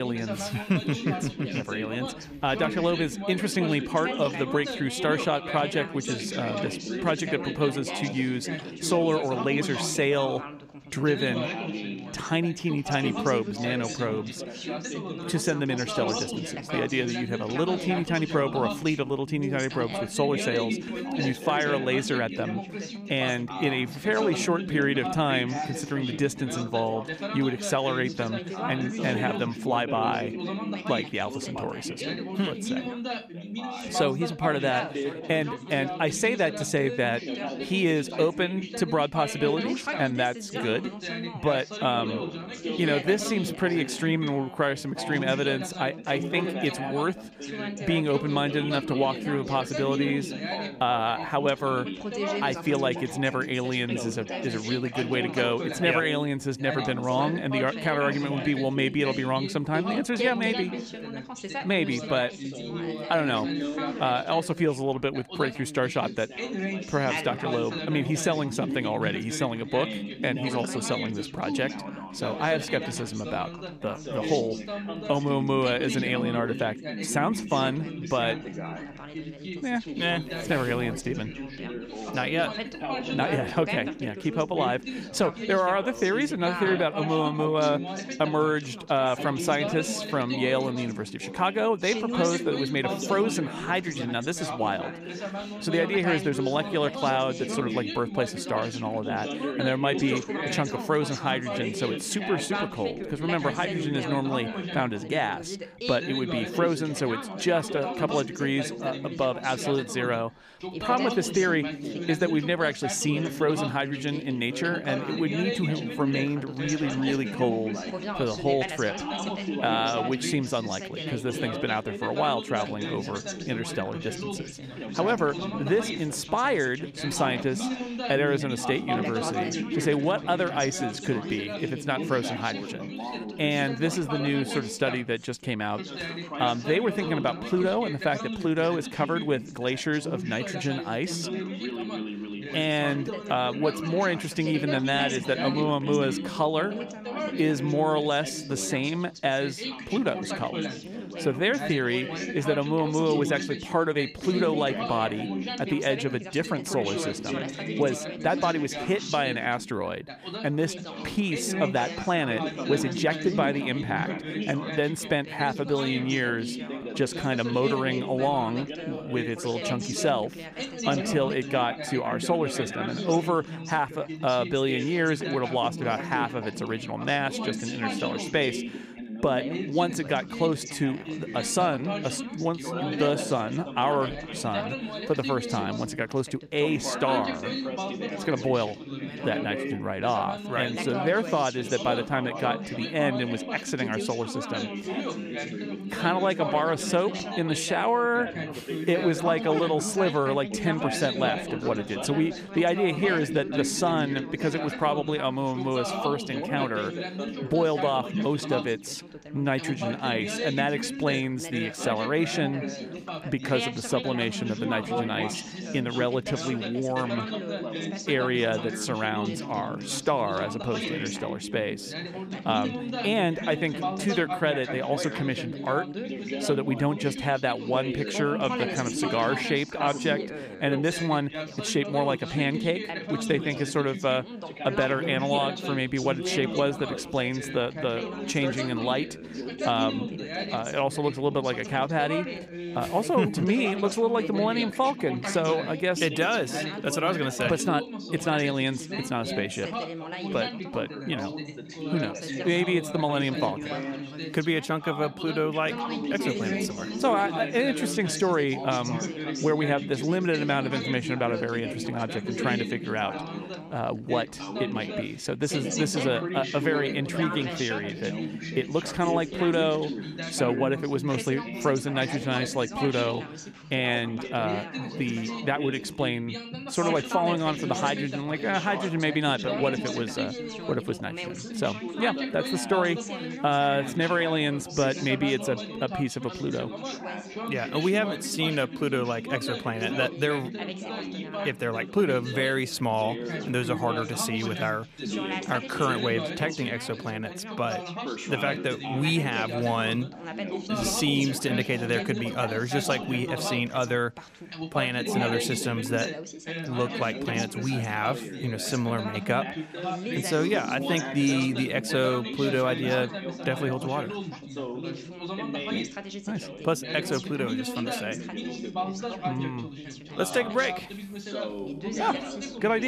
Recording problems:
background chatter; loud; throughout; 3 voices, 6 dB below the speech
abrupt cut into speech; at the start and the end

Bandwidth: 15 kHz